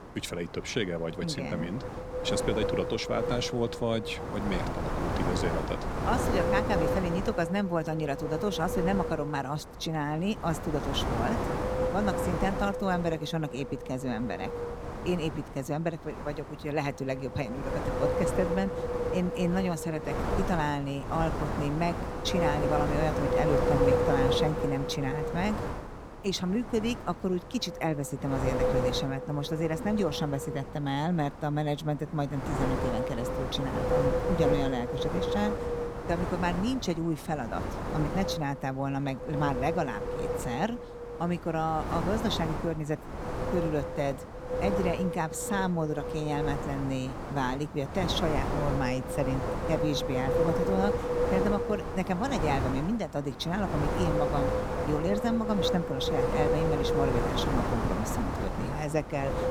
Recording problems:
wind noise on the microphone; heavy; as loud as the speech

